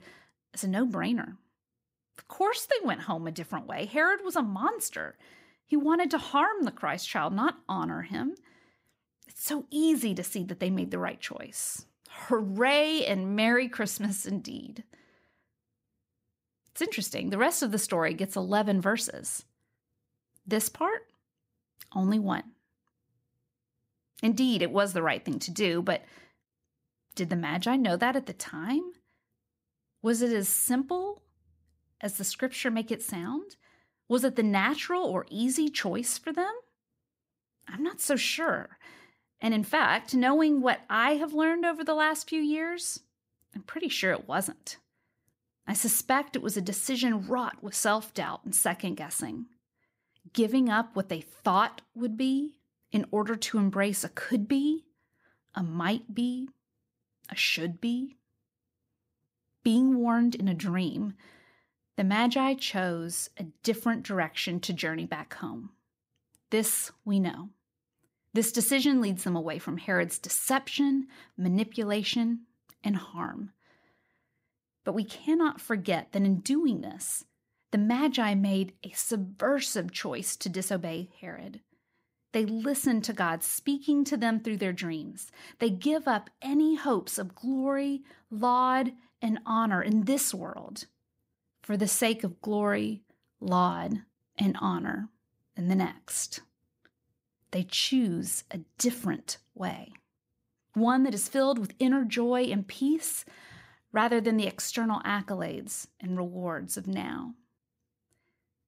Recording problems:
none

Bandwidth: 15.5 kHz